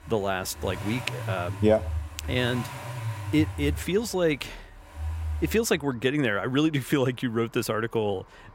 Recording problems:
traffic noise; loud; throughout; 8 dB below the speech

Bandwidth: 16 kHz